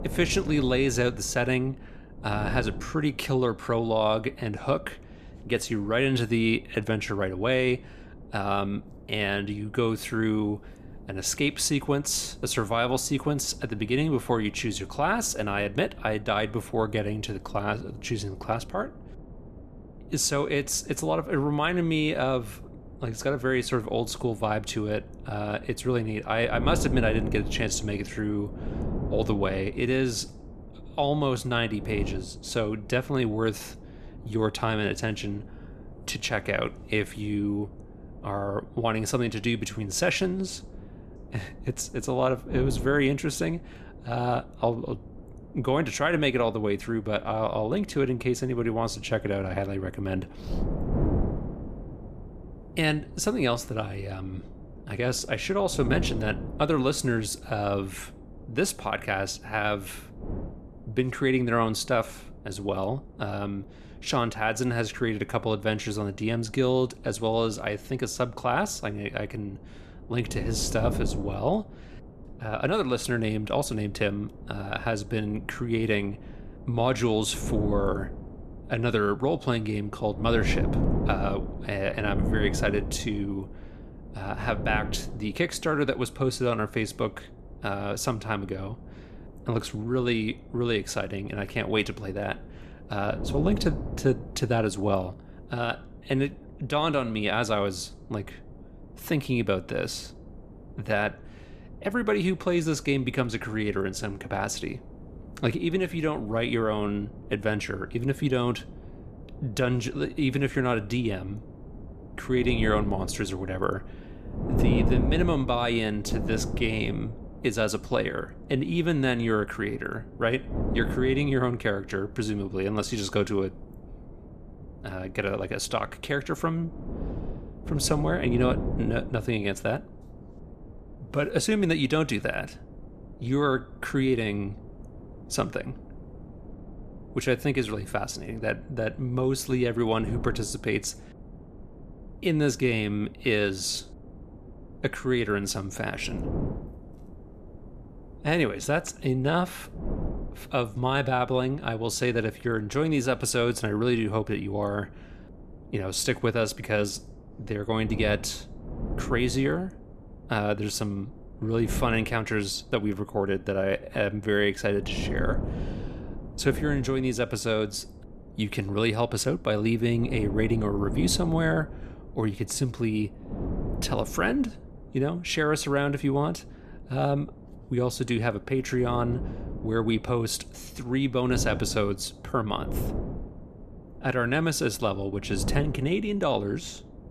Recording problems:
wind noise on the microphone; occasional gusts; 15 dB below the speech

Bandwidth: 14.5 kHz